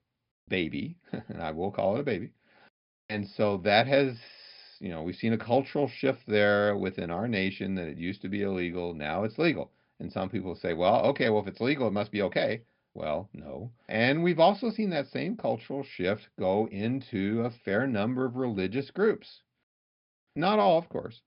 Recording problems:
high frequencies cut off; noticeable; nothing above 5.5 kHz

